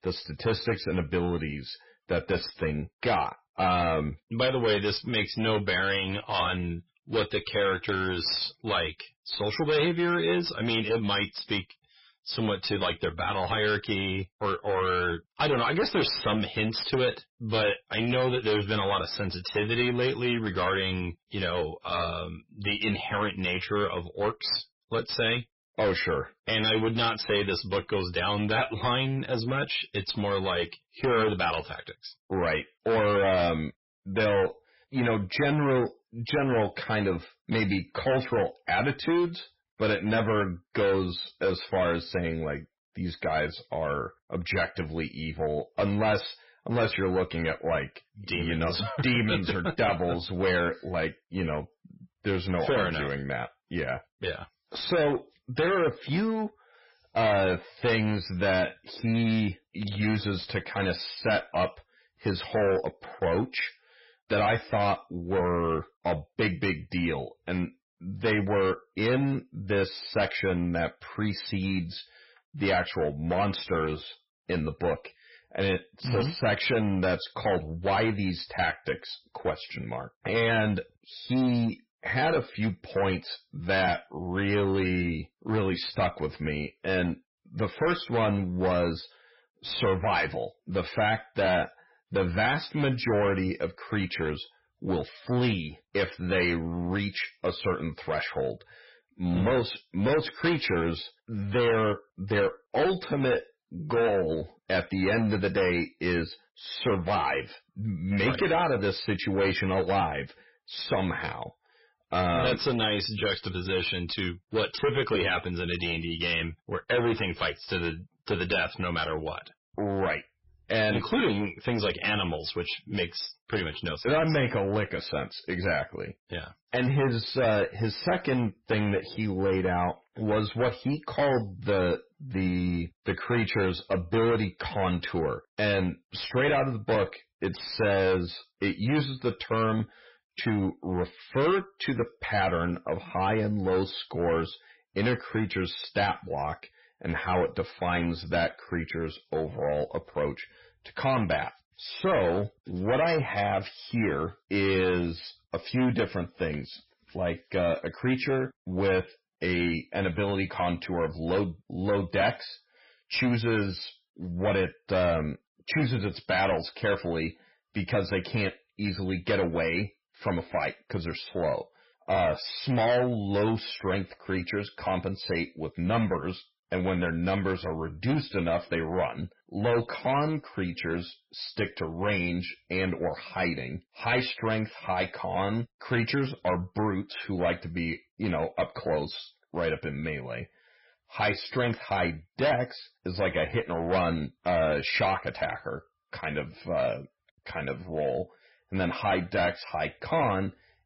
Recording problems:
distortion; heavy; 11% of the sound clipped
garbled, watery; badly; nothing above 5.5 kHz

